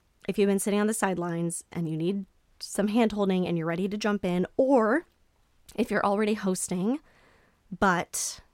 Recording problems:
none

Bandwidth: 16 kHz